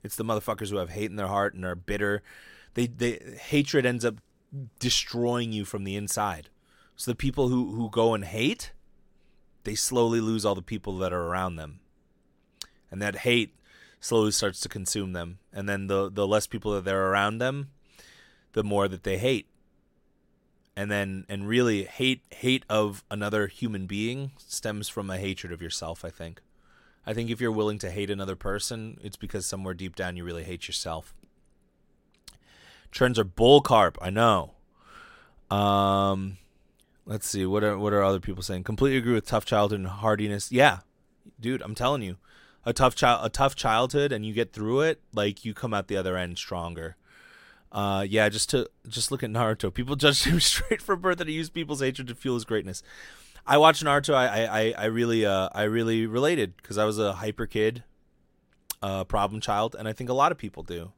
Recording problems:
none

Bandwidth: 16 kHz